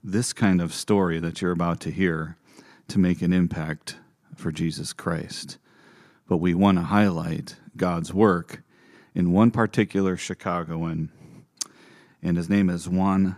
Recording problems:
none

